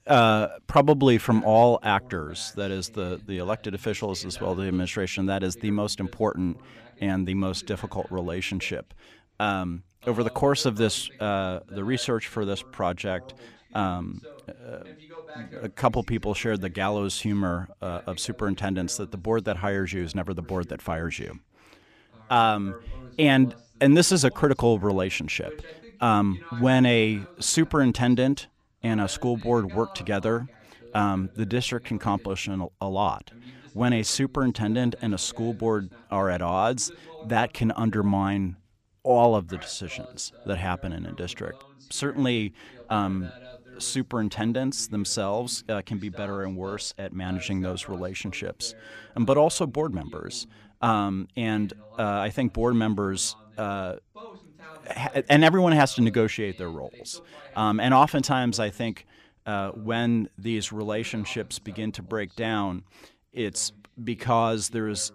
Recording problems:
voice in the background; faint; throughout; 25 dB below the speech

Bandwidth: 15 kHz